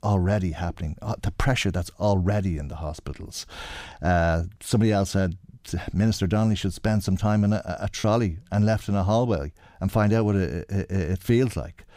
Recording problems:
choppy; occasionally; at 8 s; 2% of the speech affected

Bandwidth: 15.5 kHz